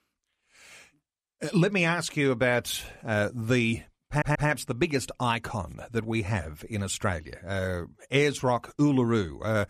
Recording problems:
audio stuttering; at 4 s

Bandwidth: 14.5 kHz